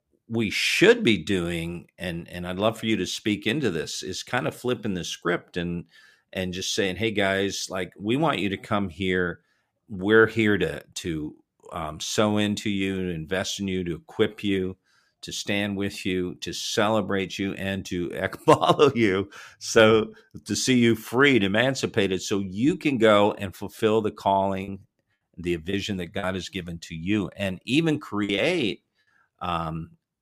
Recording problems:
choppy; very; from 24 to 26 s and at 28 s; 7% of the speech affected

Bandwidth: 15 kHz